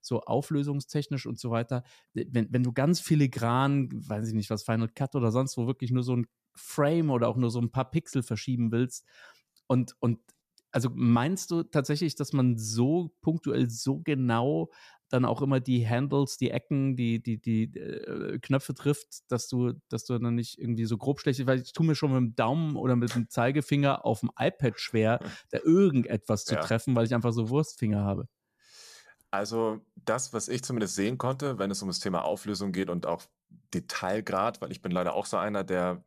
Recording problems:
none

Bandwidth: 14.5 kHz